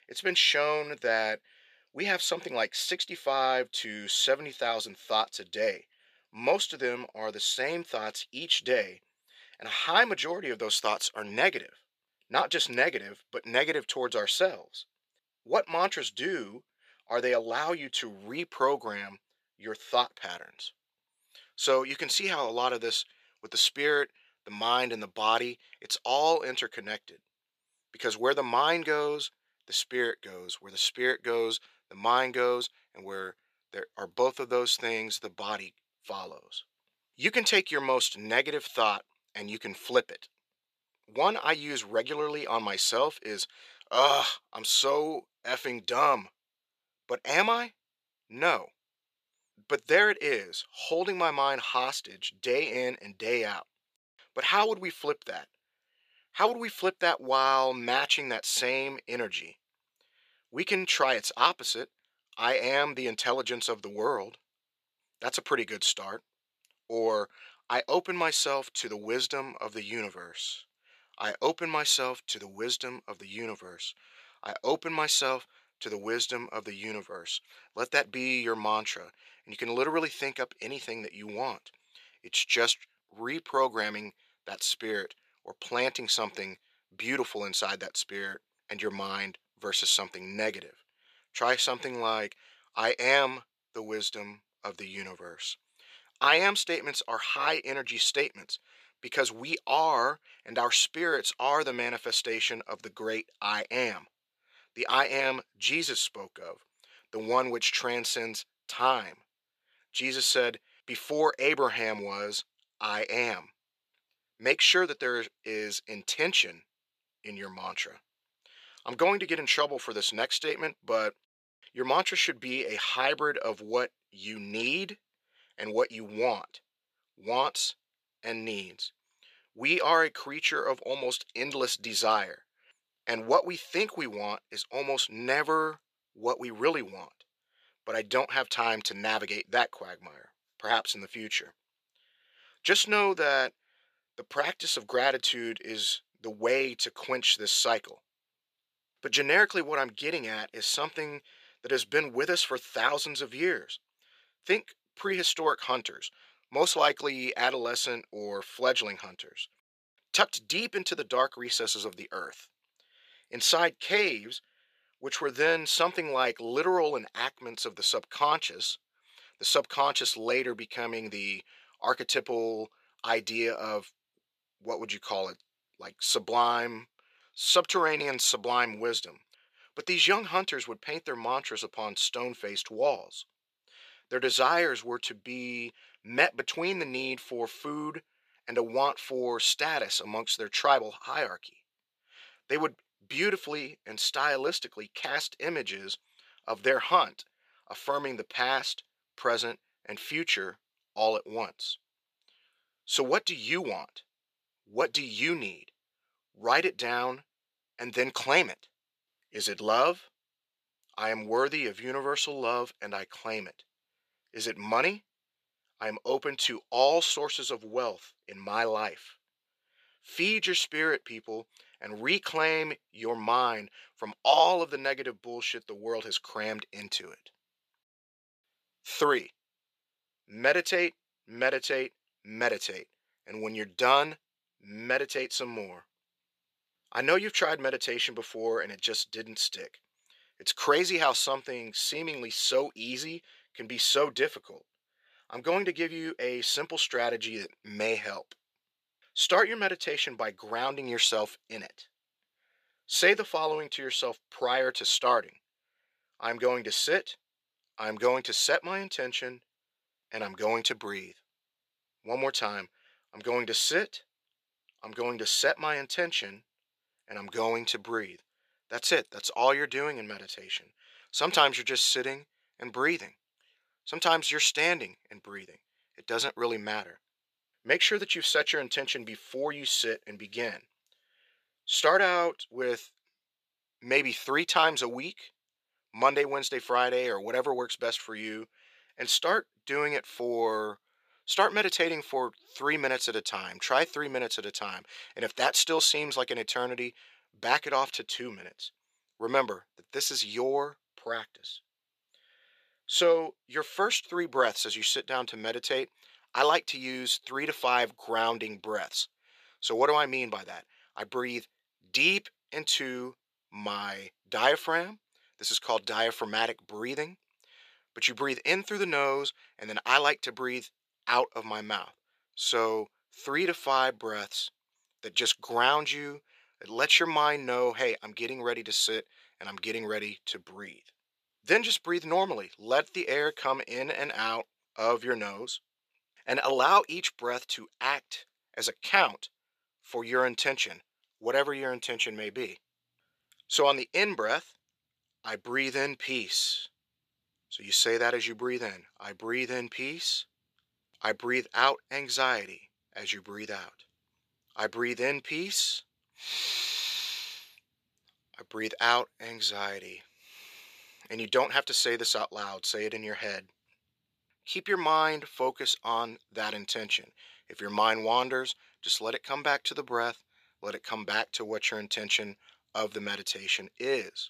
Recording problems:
thin; somewhat; fading below 450 Hz

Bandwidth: 14.5 kHz